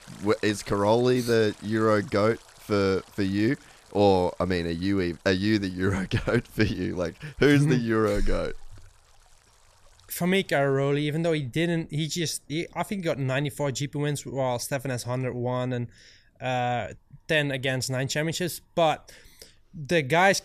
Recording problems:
rain or running water; faint; throughout; 25 dB below the speech

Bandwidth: 14.5 kHz